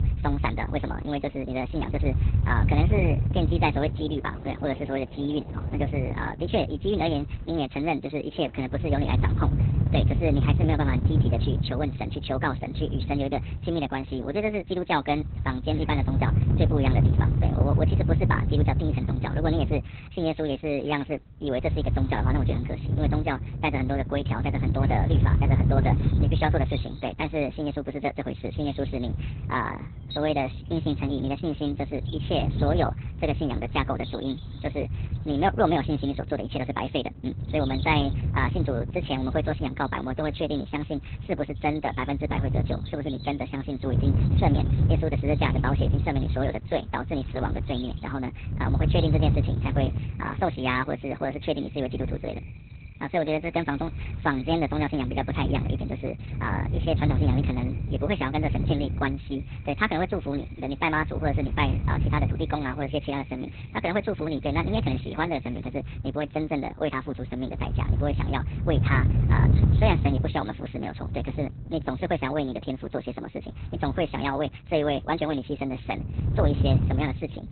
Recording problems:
garbled, watery; badly; nothing above 4 kHz
wrong speed and pitch; too fast and too high; 1.5 times normal speed
wind noise on the microphone; heavy; 9 dB below the speech
animal sounds; faint; throughout; 20 dB below the speech

